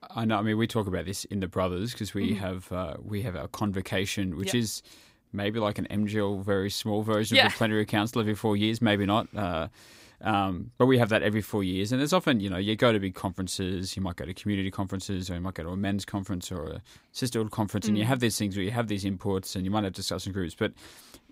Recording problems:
none

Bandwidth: 15.5 kHz